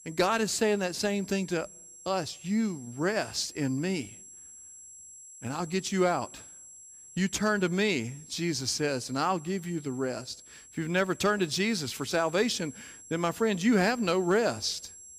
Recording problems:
high-pitched whine; noticeable; throughout; 7.5 kHz, 20 dB below the speech

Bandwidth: 15 kHz